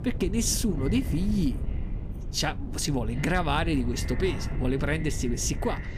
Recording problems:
echo of what is said; faint; throughout; 350 ms later, 20 dB below the speech
wind noise on the microphone; occasional gusts; 15 dB below the speech

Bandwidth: 14.5 kHz